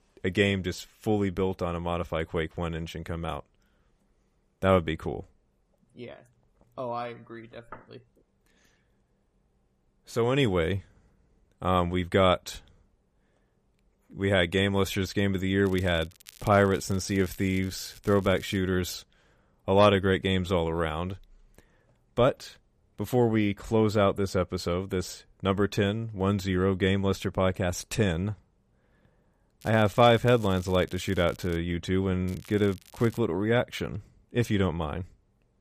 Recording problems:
crackling; faint; from 16 to 19 s, from 30 to 32 s and at 32 s; 25 dB below the speech

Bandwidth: 14.5 kHz